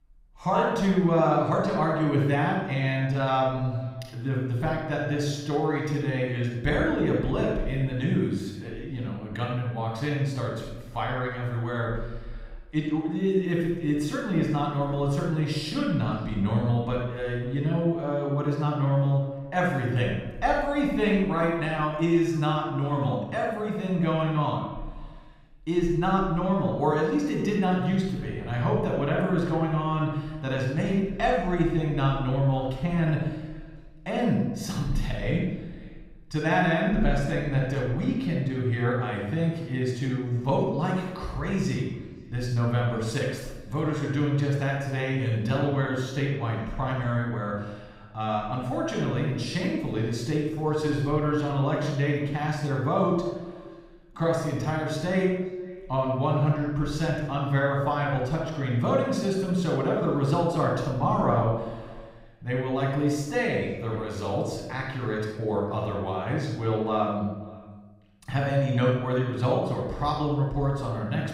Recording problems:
off-mic speech; far
room echo; noticeable; dies away in 0.9 s
echo of what is said; faint; throughout; 530 ms later, 25 dB below the speech

